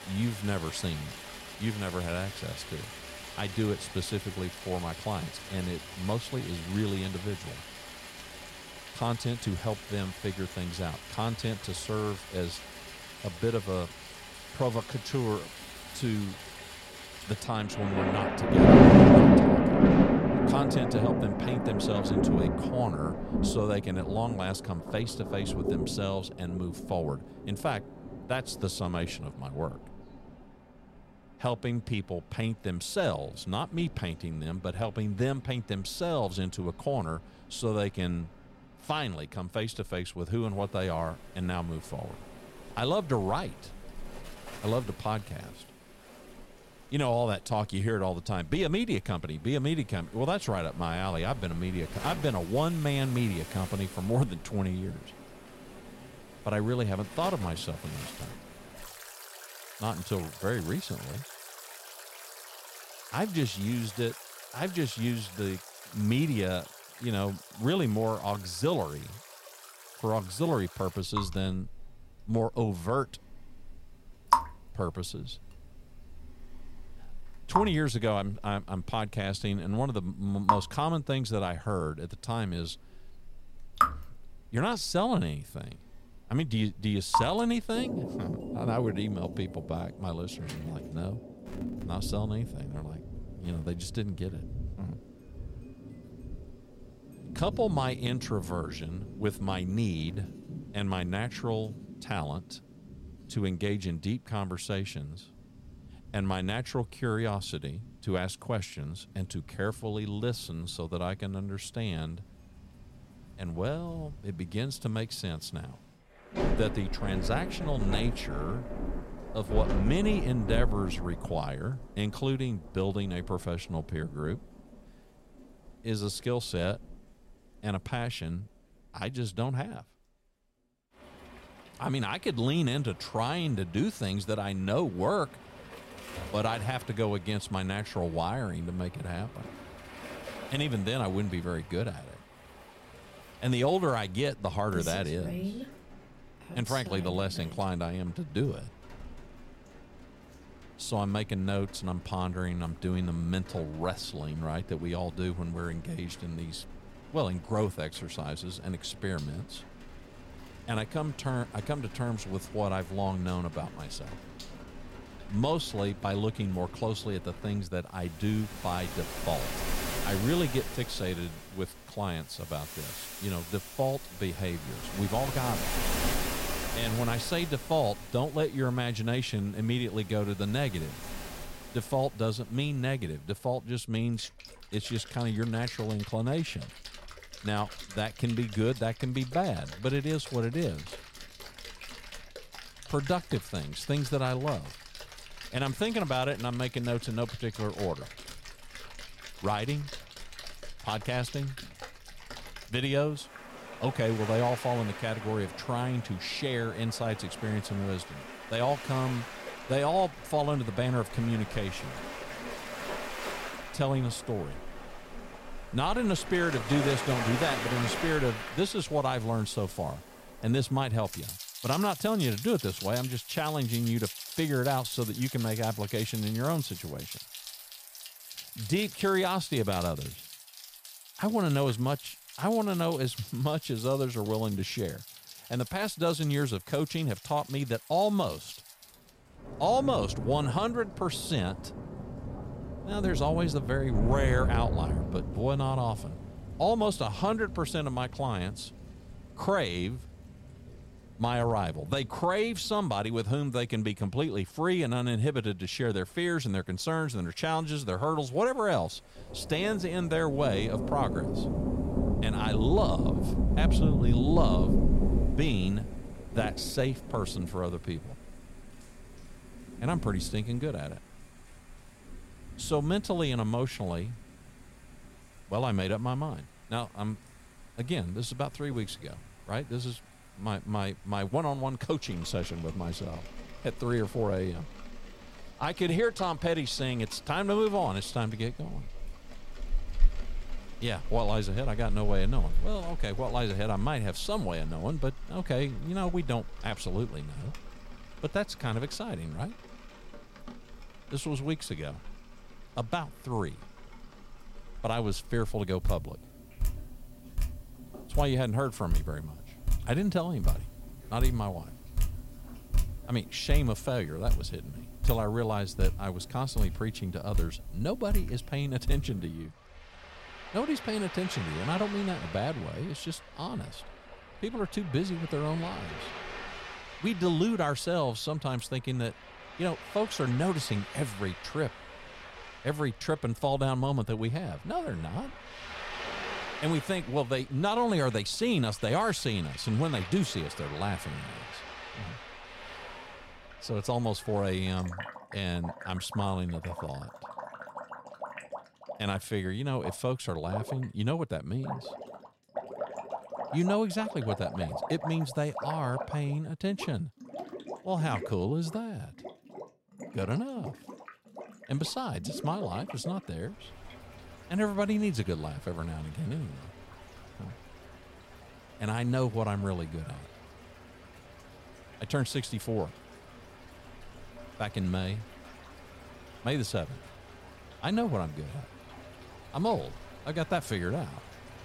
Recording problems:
rain or running water; loud; throughout; 2 dB below the speech

